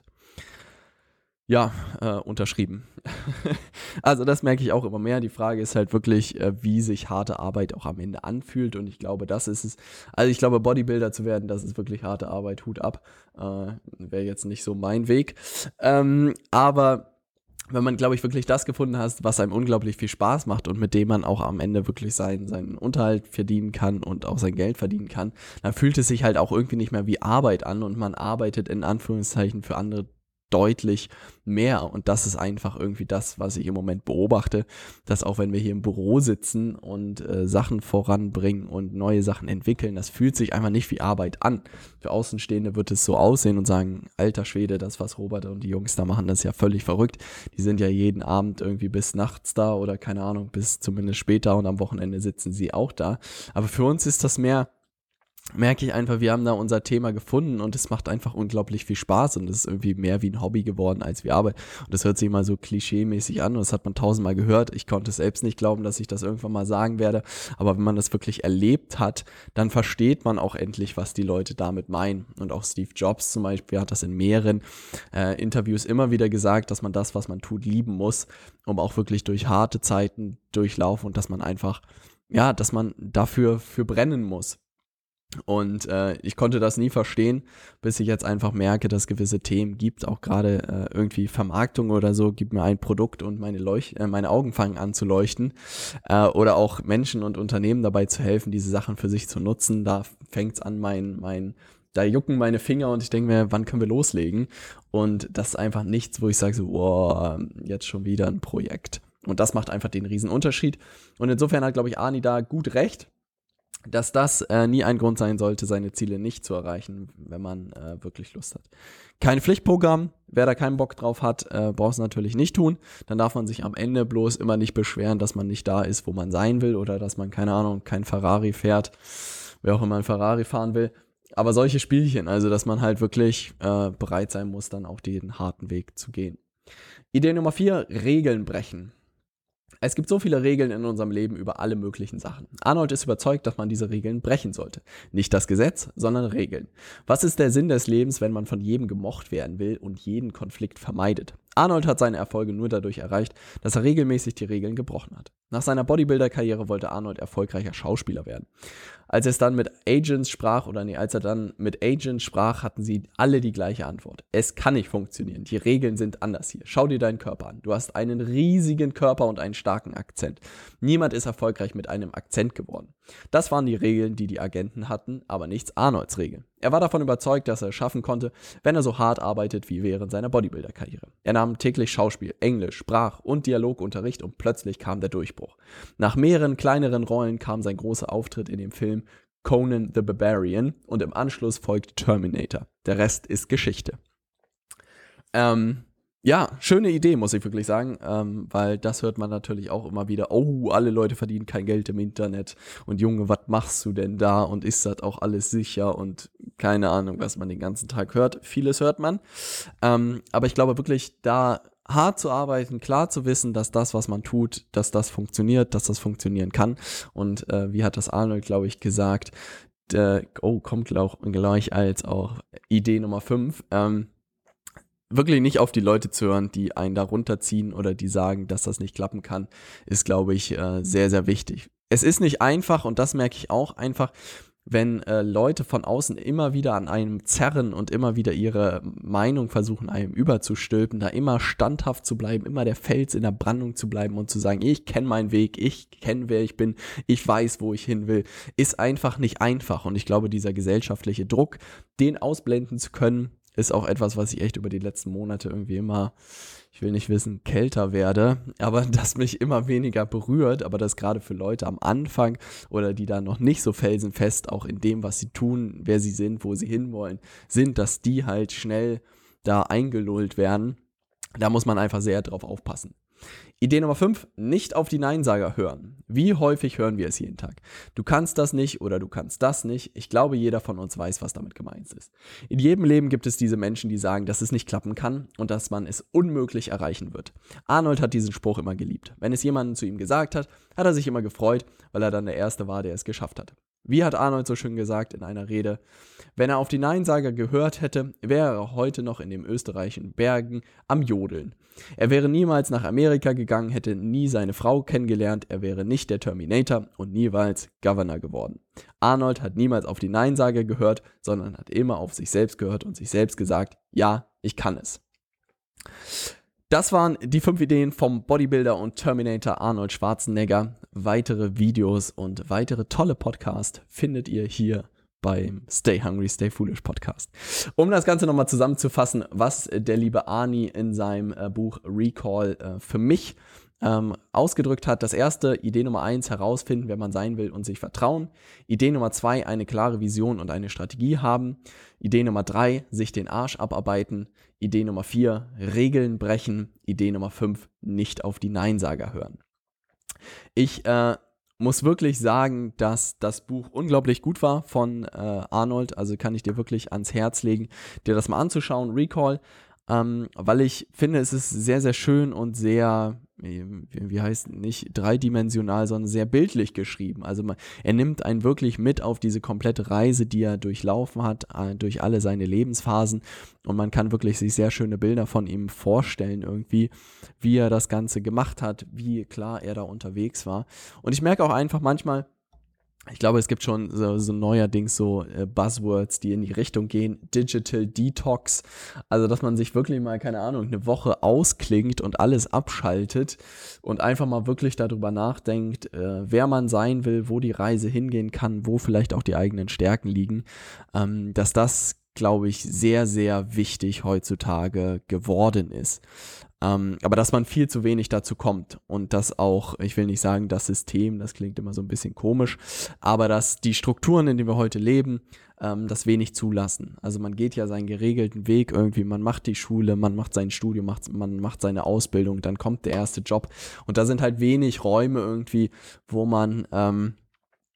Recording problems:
none

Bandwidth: 17.5 kHz